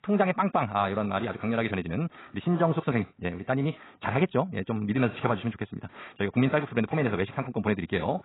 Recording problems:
garbled, watery; badly; nothing above 4 kHz
wrong speed, natural pitch; too fast; 1.6 times normal speed

